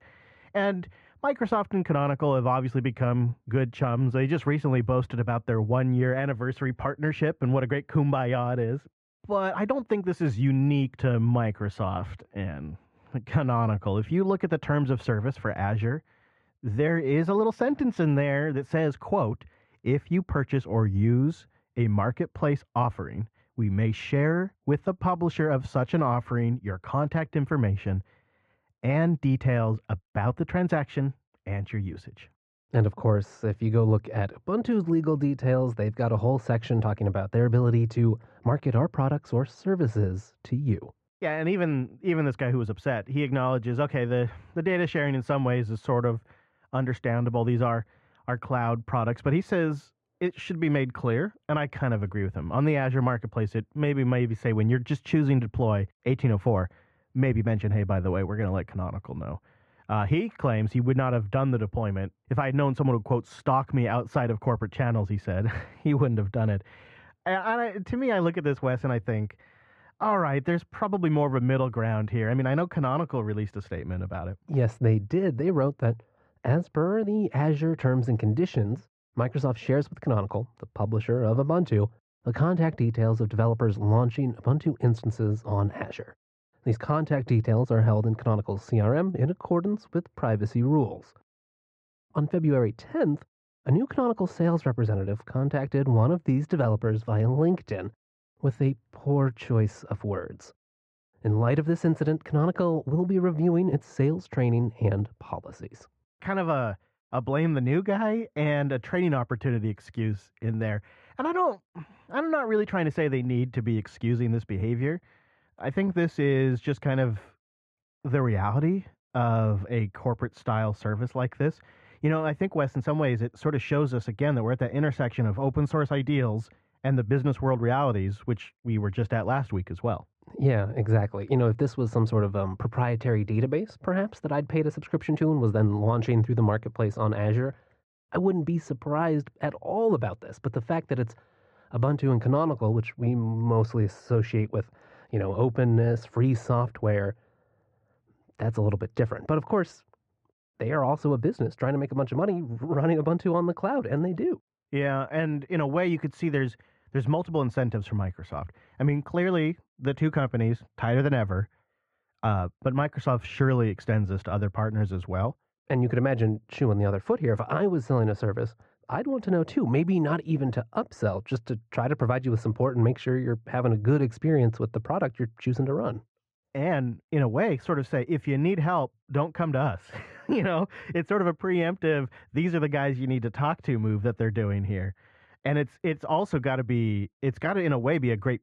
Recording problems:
muffled; very; fading above 1.5 kHz

